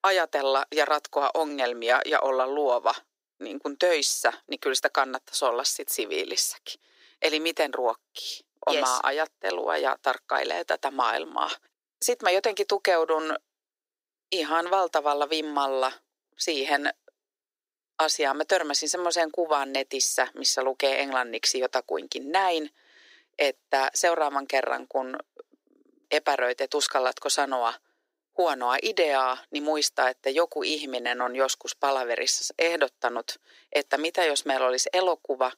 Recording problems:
thin; very; fading below 350 Hz

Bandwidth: 15.5 kHz